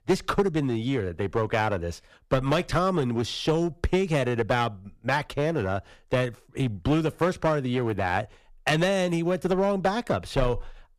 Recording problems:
distortion; slight; 5% of the sound clipped

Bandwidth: 14.5 kHz